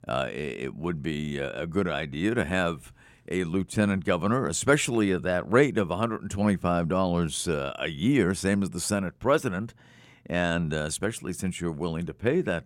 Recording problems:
none

